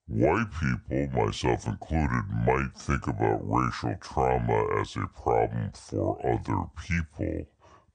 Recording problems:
wrong speed and pitch; too slow and too low; 0.6 times normal speed

